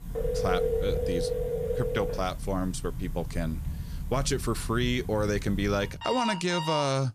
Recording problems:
alarms or sirens; loud; throughout; 3 dB below the speech

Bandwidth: 14.5 kHz